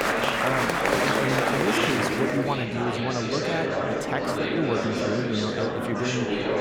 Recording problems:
murmuring crowd; very loud; throughout; 5 dB above the speech

